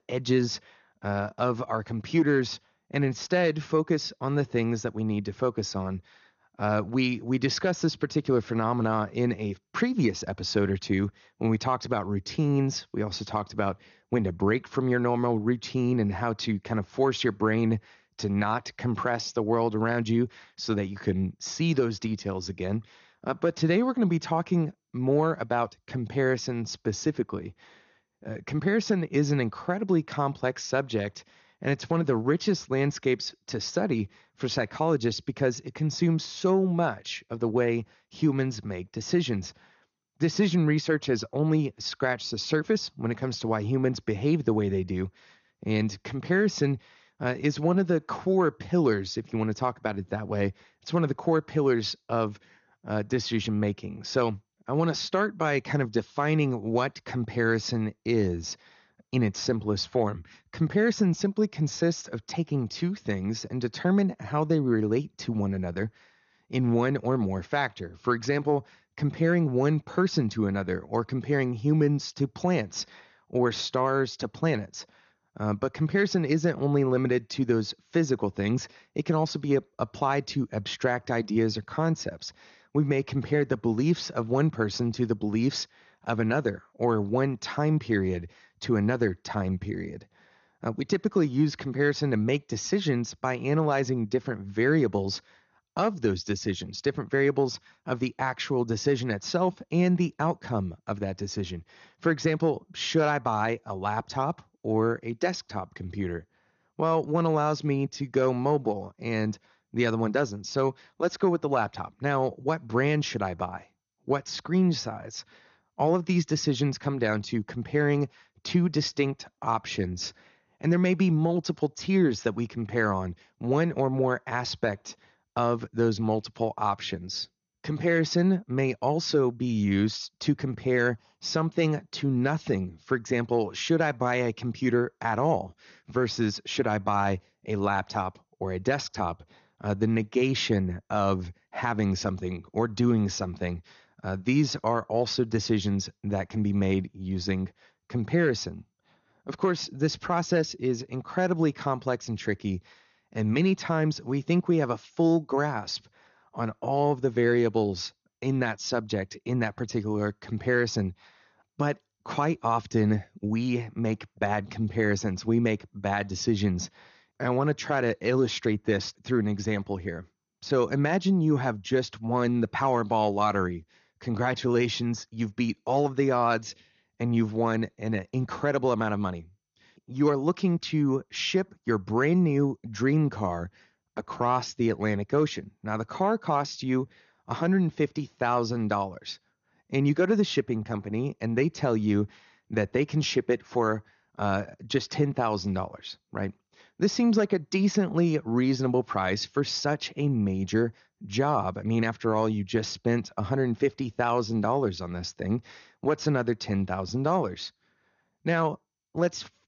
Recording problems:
garbled, watery; slightly; nothing above 6.5 kHz

